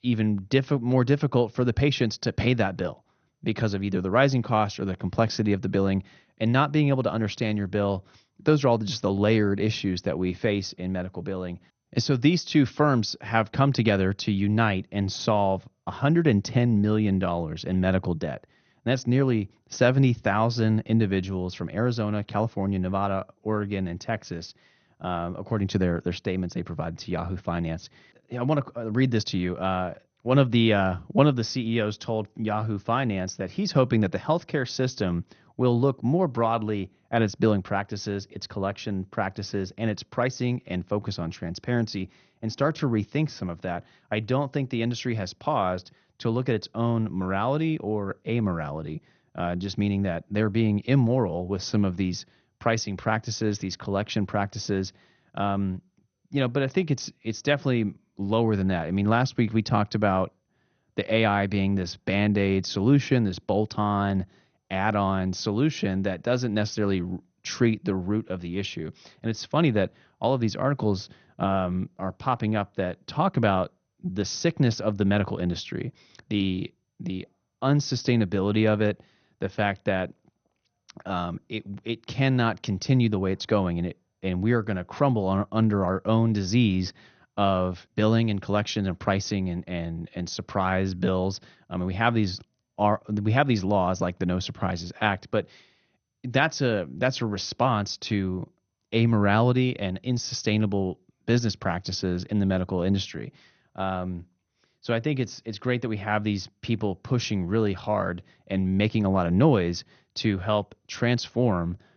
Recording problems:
garbled, watery; slightly; nothing above 6.5 kHz

